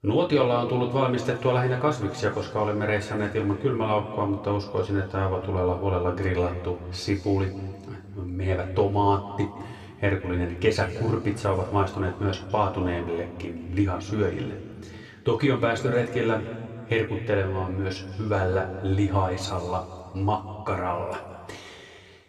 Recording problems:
room echo; slight; dies away in 1.9 s
off-mic speech; somewhat distant

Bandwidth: 13.5 kHz